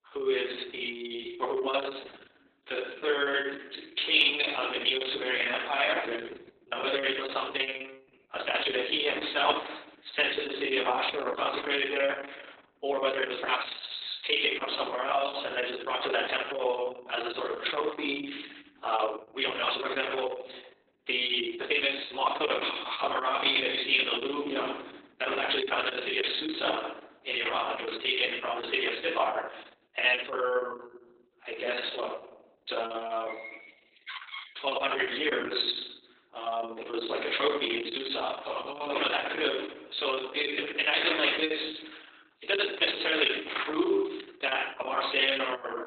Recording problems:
garbled, watery; badly; nothing above 4 kHz
thin; somewhat; fading below 300 Hz
room echo; slight; dies away in 0.7 s
off-mic speech; somewhat distant
uneven, jittery; strongly; from 0.5 to 45 s
door banging; faint; from 33 to 35 s; peak 10 dB below the speech

